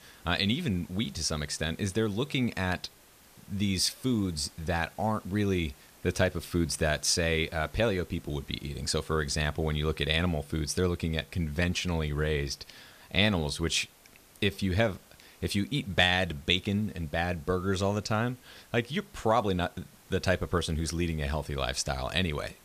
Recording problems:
hiss; faint; throughout; 25 dB below the speech

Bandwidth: 14.5 kHz